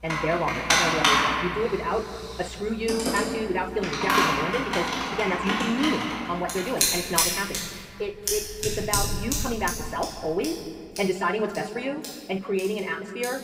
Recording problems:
wrong speed, natural pitch; too fast; 1.6 times normal speed
room echo; slight; dies away in 1.9 s
off-mic speech; somewhat distant
household noises; very loud; throughout; 3 dB above the speech

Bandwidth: 15.5 kHz